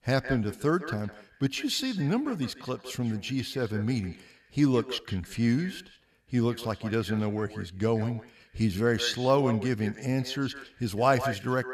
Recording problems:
echo of what is said; noticeable; throughout; 160 ms later, 15 dB below the speech

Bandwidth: 13.5 kHz